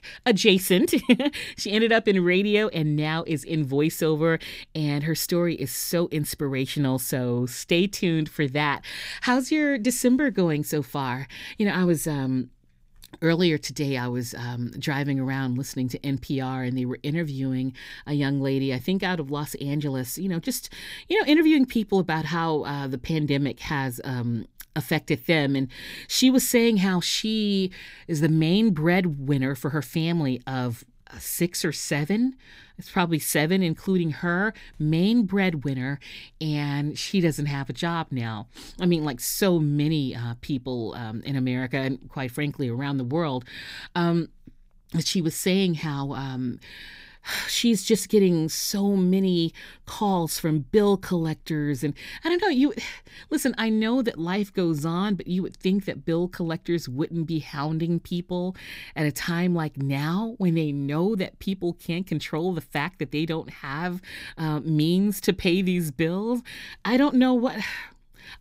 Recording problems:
none

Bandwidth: 15.5 kHz